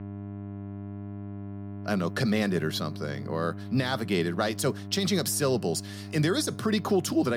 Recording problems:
electrical hum; noticeable; throughout; 50 Hz, 15 dB below the speech
abrupt cut into speech; at the end

